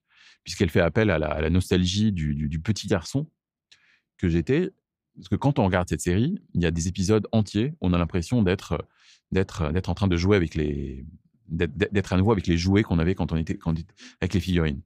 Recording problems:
none

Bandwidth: 15.5 kHz